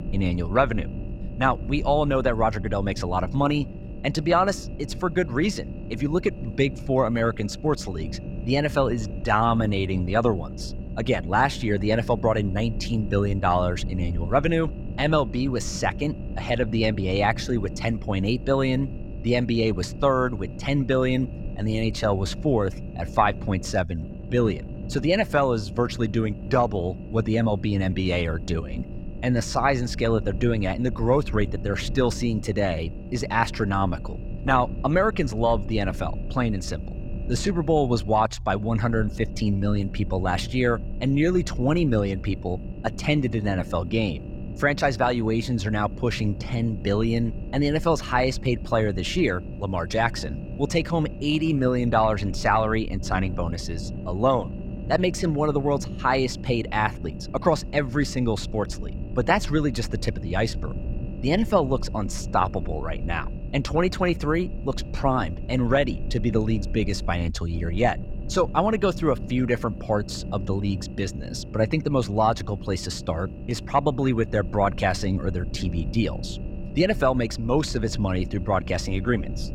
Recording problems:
low rumble; noticeable; throughout; 20 dB below the speech

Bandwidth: 16.5 kHz